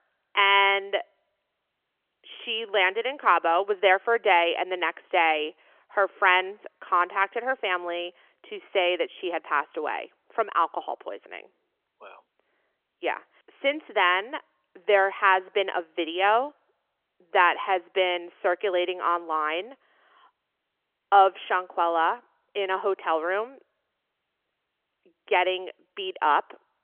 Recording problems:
phone-call audio; nothing above 3 kHz

